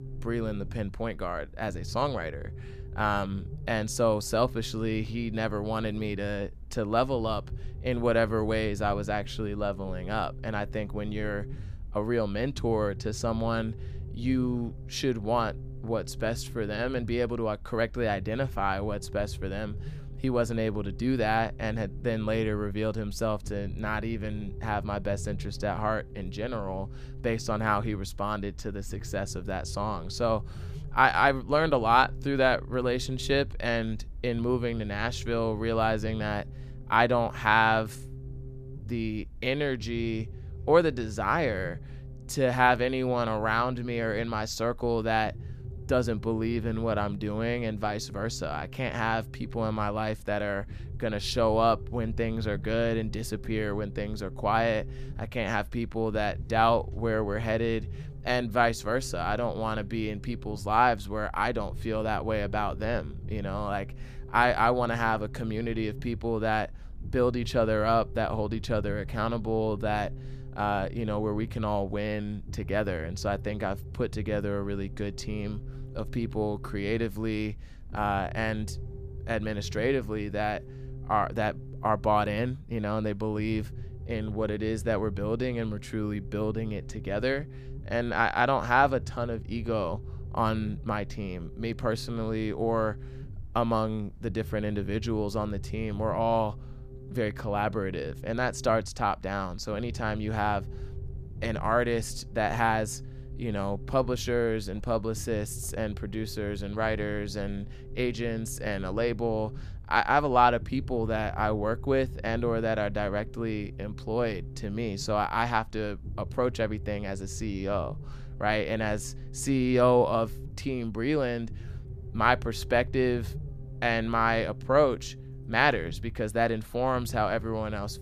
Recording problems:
low rumble; faint; throughout; 25 dB below the speech

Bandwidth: 14.5 kHz